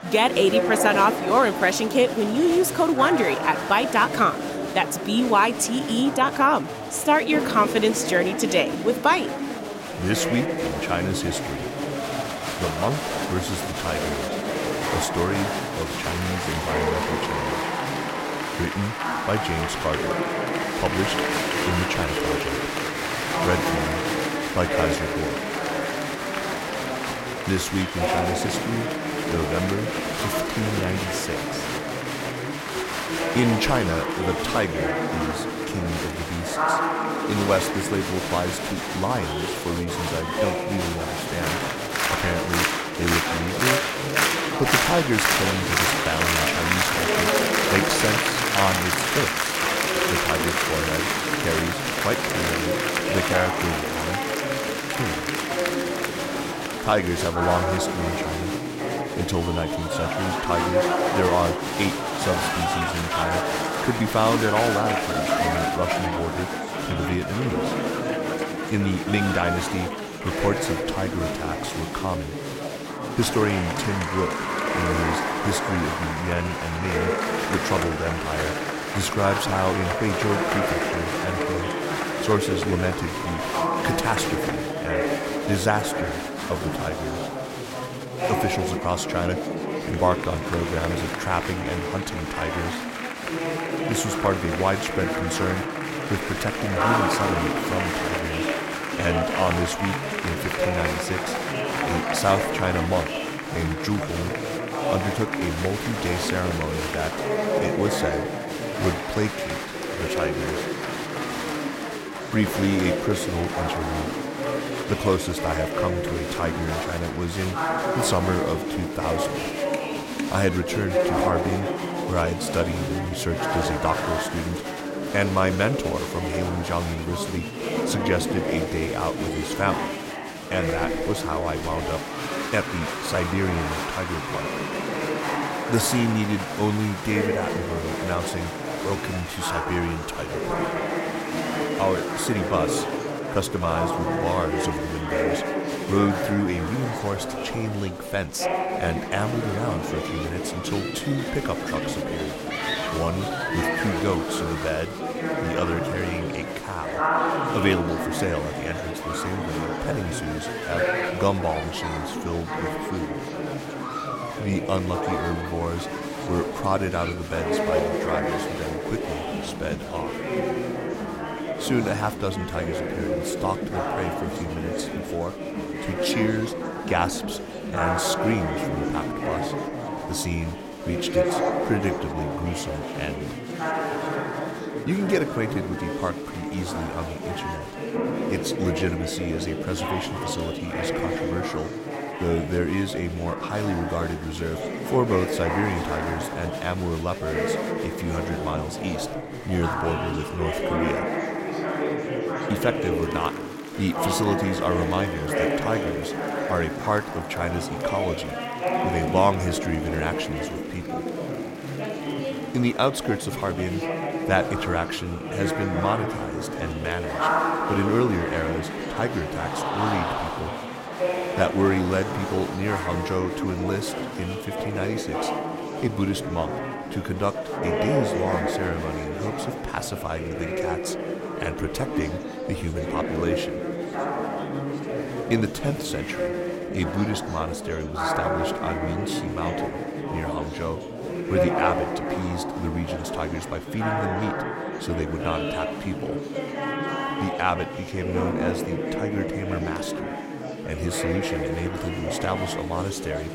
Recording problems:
chatter from many people; very loud; throughout; as loud as the speech

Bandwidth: 16 kHz